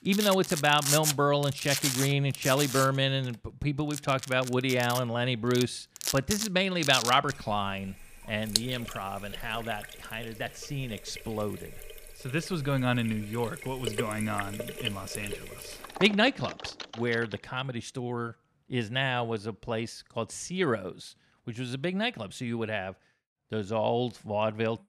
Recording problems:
household noises; loud; until 17 s; 5 dB below the speech

